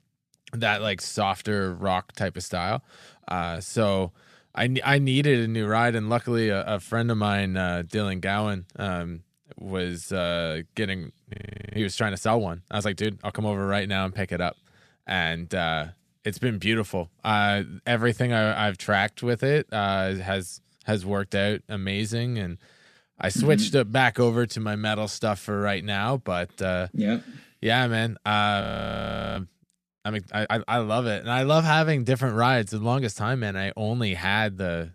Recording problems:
audio freezing; at 11 s and at 29 s for 0.5 s

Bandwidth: 14.5 kHz